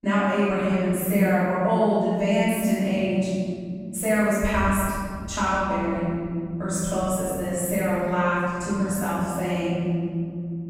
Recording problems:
room echo; strong; dies away in 3 s
off-mic speech; far

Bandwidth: 16 kHz